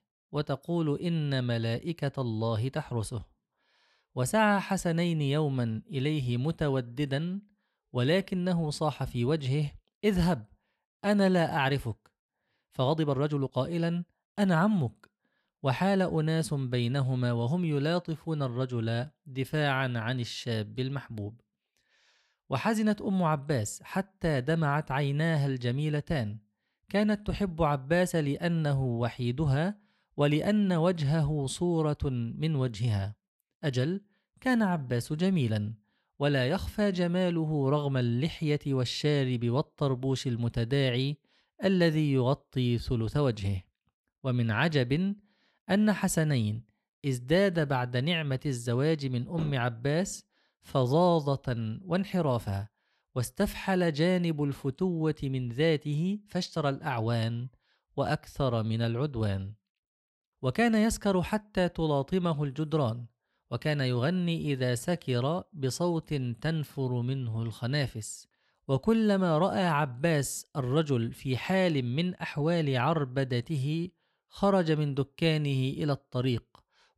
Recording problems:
uneven, jittery; strongly; from 11 s to 1:09

